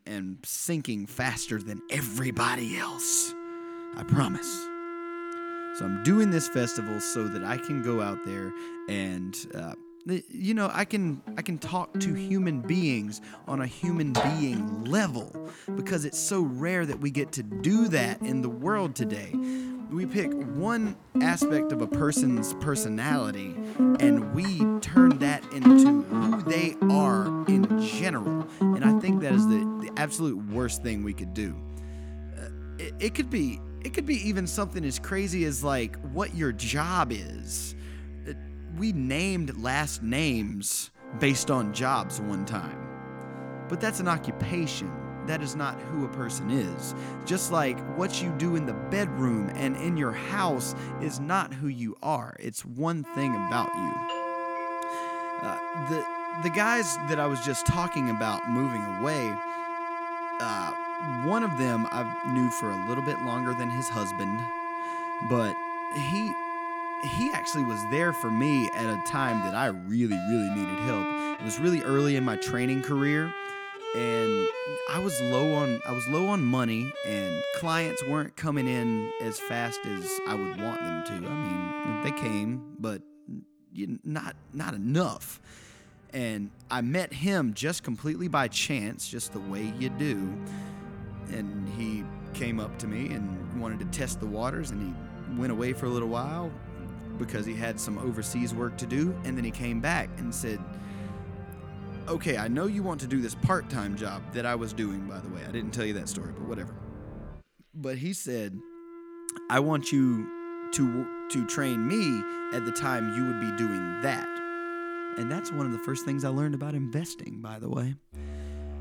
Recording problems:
background music; loud; throughout; 2 dB below the speech
doorbell; noticeable; from 54 to 56 s; peak 8 dB below the speech
alarm; noticeable; from 1:09 to 1:11; peak 5 dB below the speech

